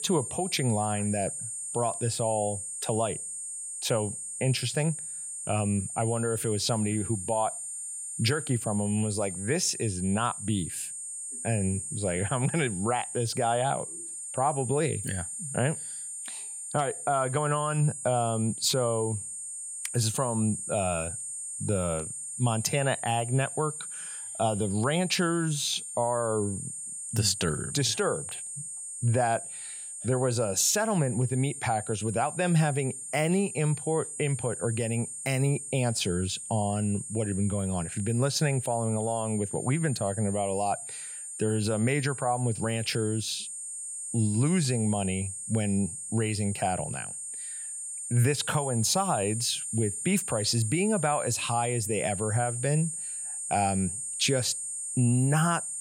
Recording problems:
high-pitched whine; loud; throughout; 8.5 kHz, 6 dB below the speech

